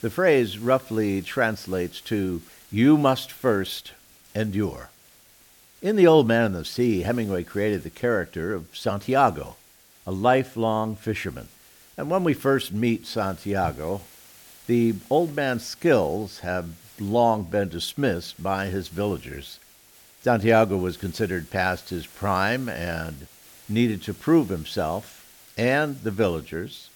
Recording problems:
hiss; faint; throughout; 25 dB below the speech

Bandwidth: 17.5 kHz